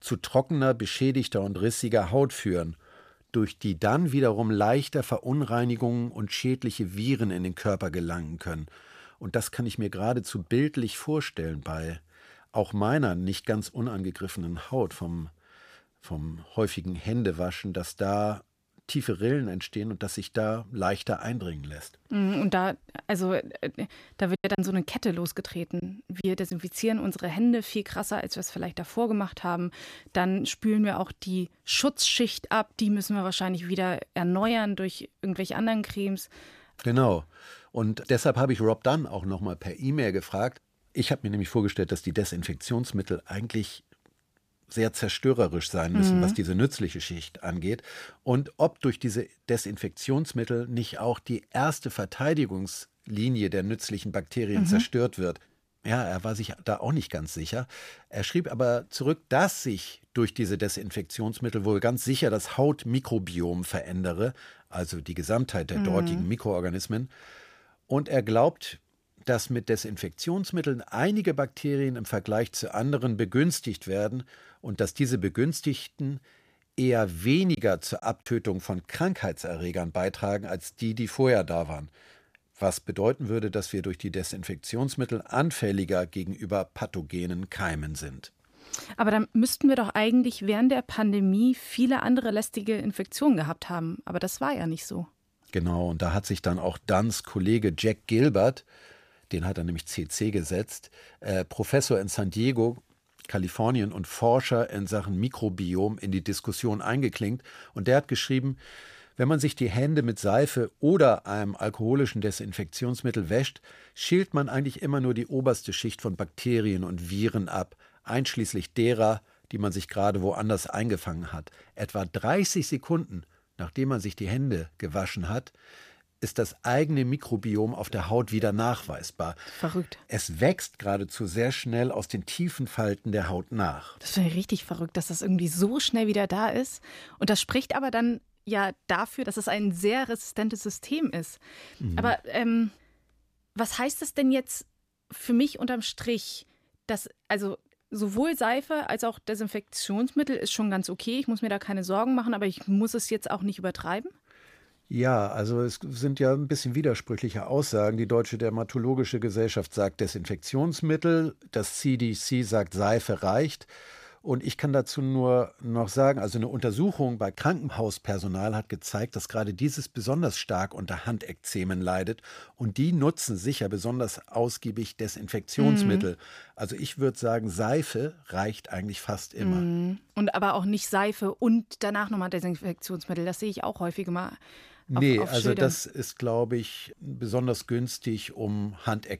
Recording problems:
choppy; very; from 24 to 27 s and at 1:18; 7% of the speech affected

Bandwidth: 15 kHz